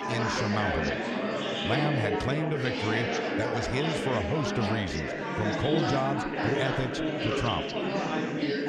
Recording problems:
chatter from many people; very loud; throughout; 2 dB above the speech

